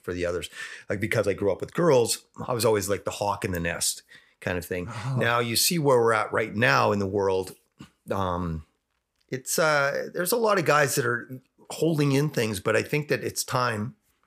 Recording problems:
none

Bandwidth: 15 kHz